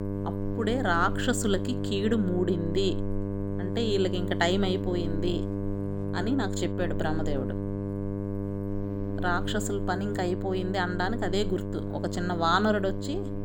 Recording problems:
electrical hum; loud; throughout; 50 Hz, 8 dB below the speech

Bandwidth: 18 kHz